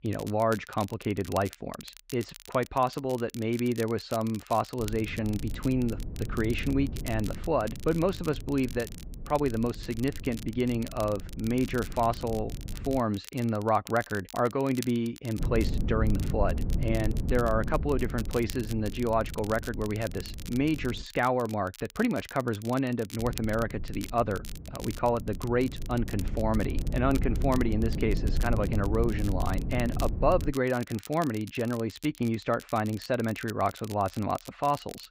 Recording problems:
muffled; slightly; fading above 2.5 kHz
low rumble; noticeable; from 5 to 13 s, from 15 to 21 s and from 23 to 31 s; 15 dB below the speech
crackle, like an old record; noticeable; 15 dB below the speech

